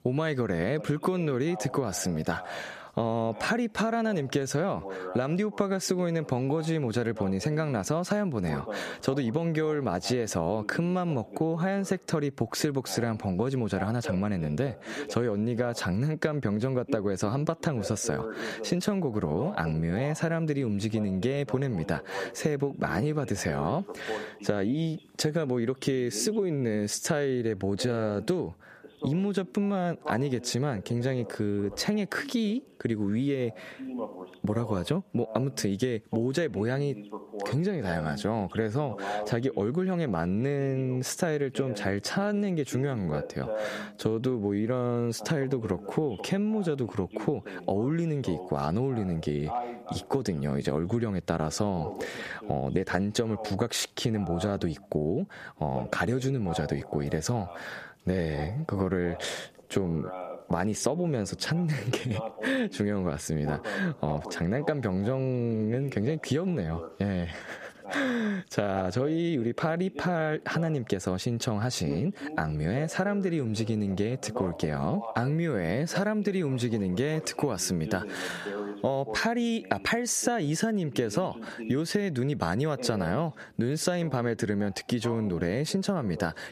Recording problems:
squashed, flat; somewhat, background pumping
voice in the background; noticeable; throughout; 15 dB below the speech

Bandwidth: 14.5 kHz